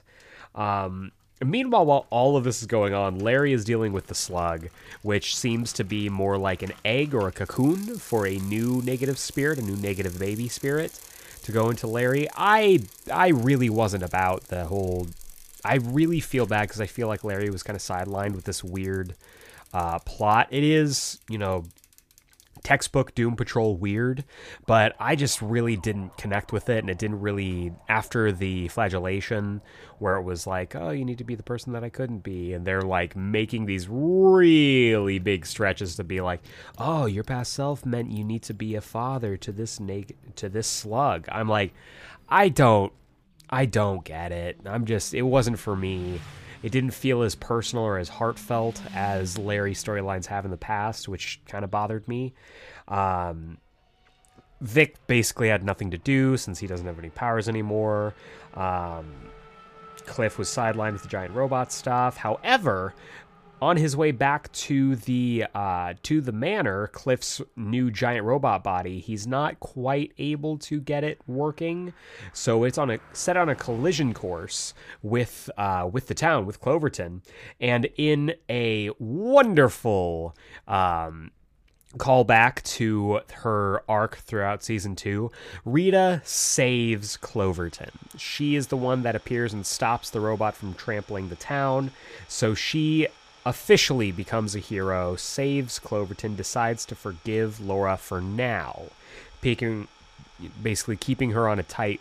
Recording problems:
traffic noise; faint; throughout; 25 dB below the speech

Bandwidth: 15 kHz